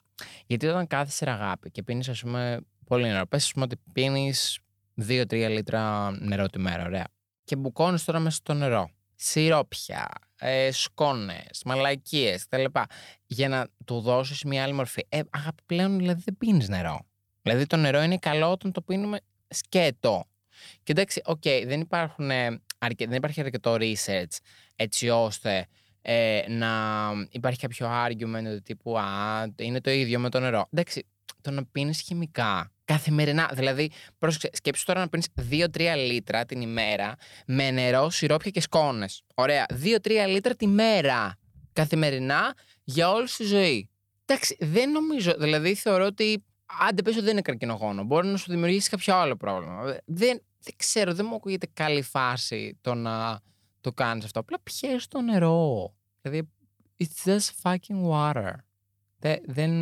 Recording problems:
abrupt cut into speech; at the end

